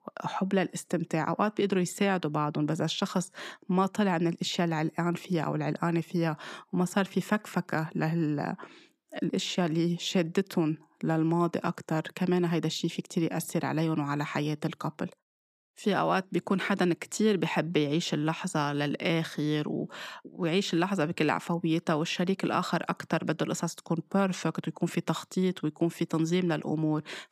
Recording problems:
none

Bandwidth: 15 kHz